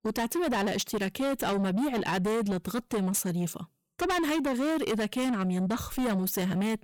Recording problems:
distortion; heavy; 7 dB below the speech

